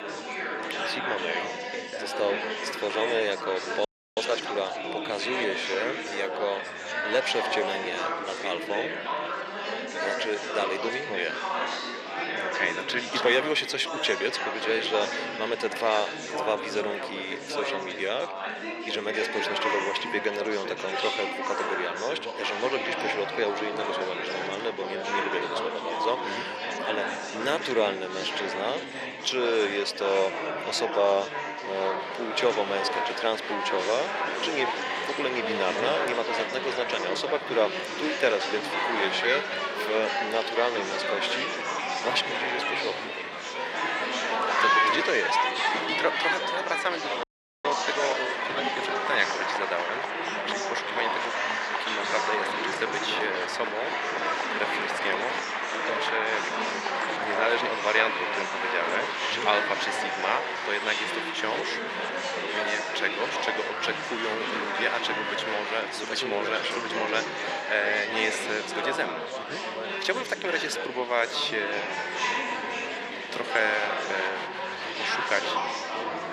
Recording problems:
thin; somewhat; fading below 450 Hz
chatter from many people; very loud; throughout; as loud as the speech
audio freezing; at 4 s and at 47 s

